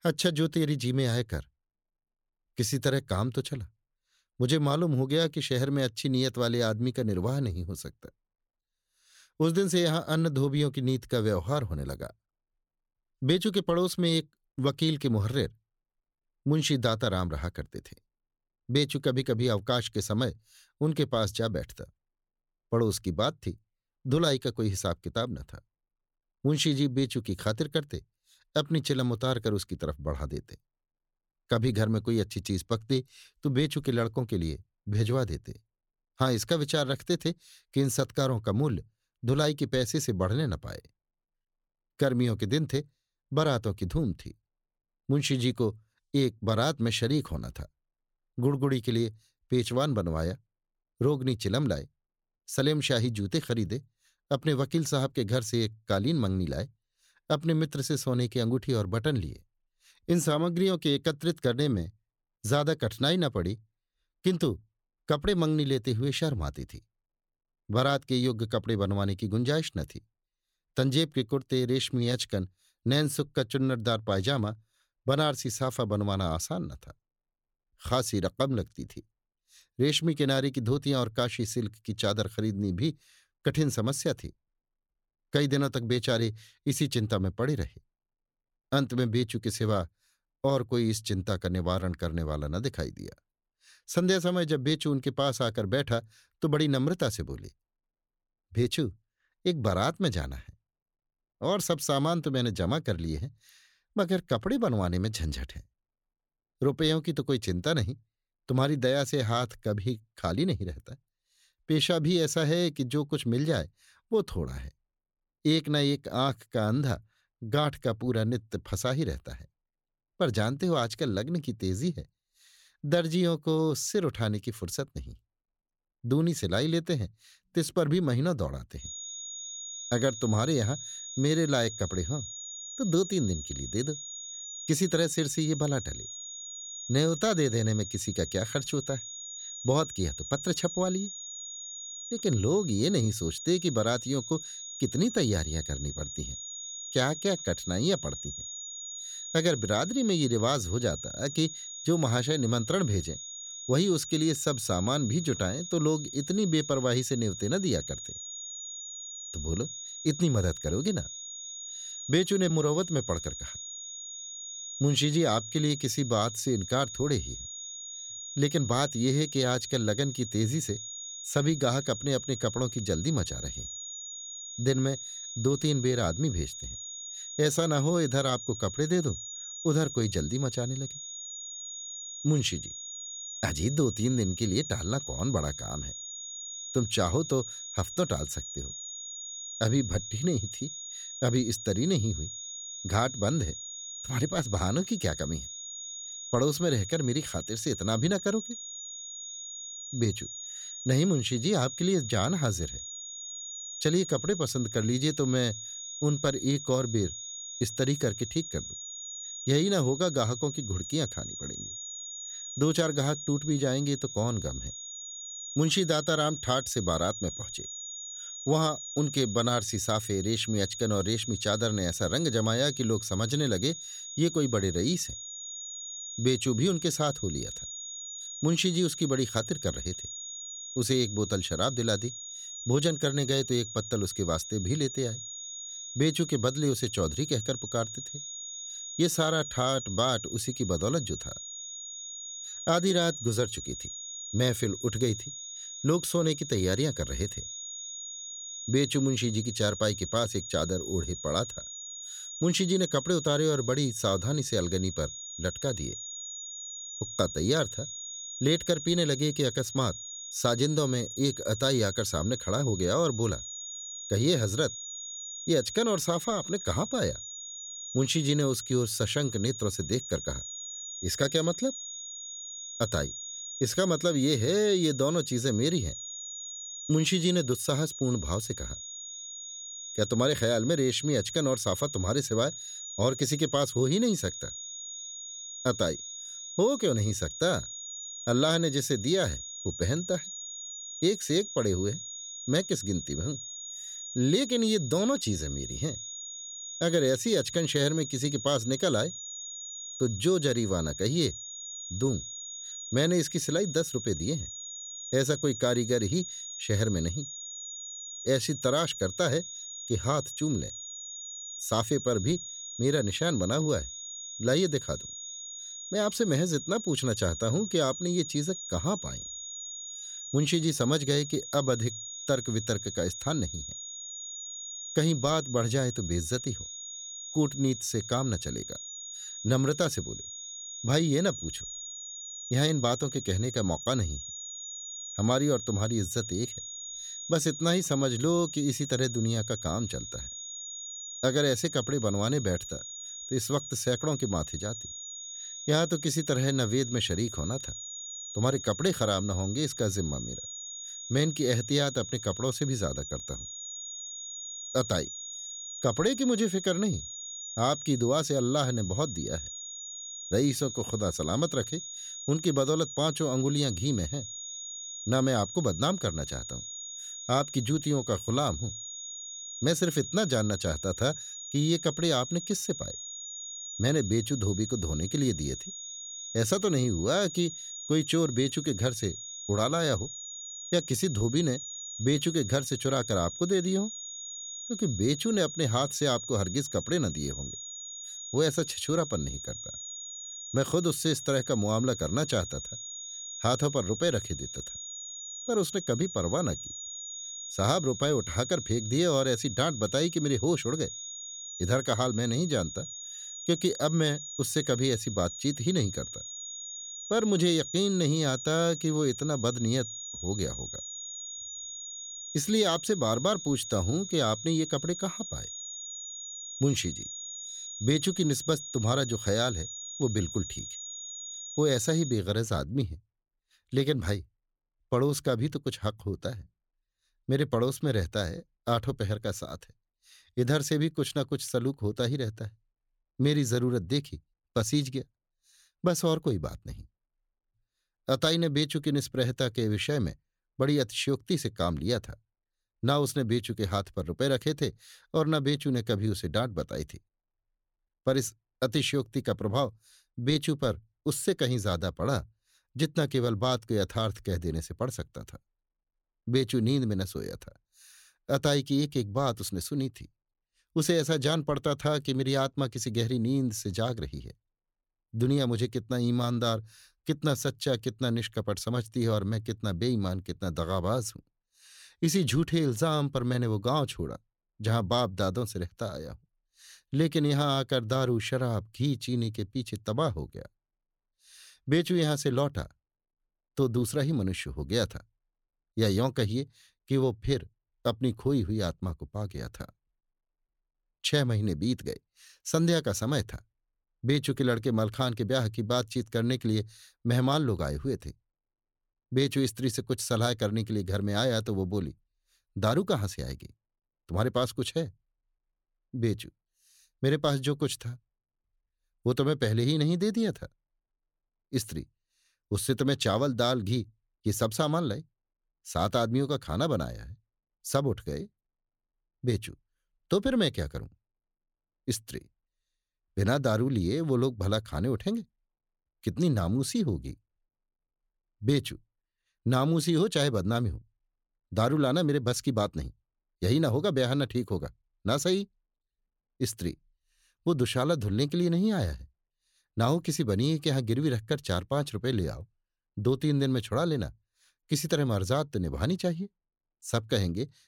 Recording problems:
high-pitched whine; loud; from 2:09 to 7:02; 6.5 kHz, 8 dB below the speech

